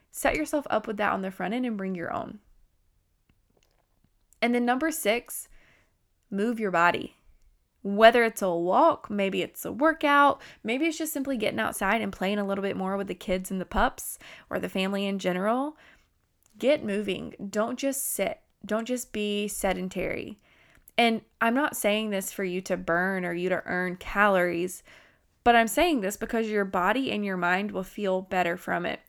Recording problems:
none

